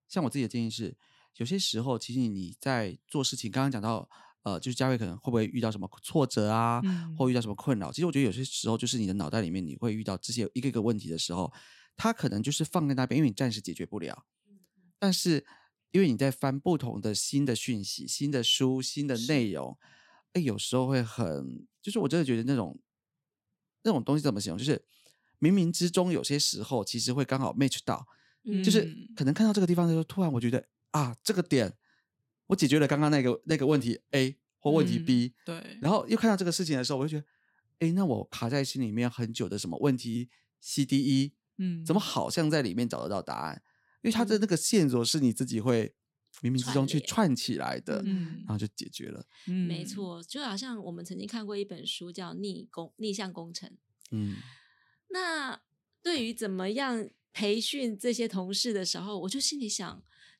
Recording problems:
none

